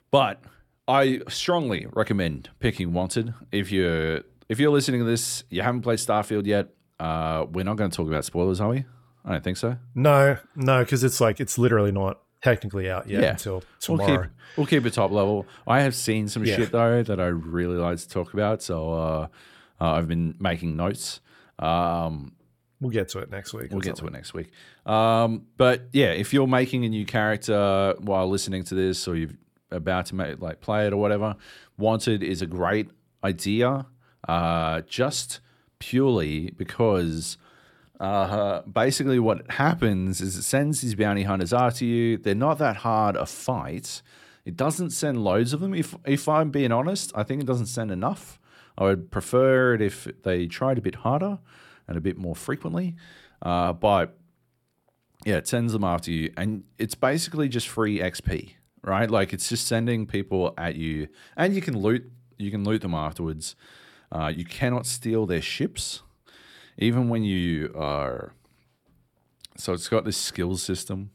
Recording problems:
none

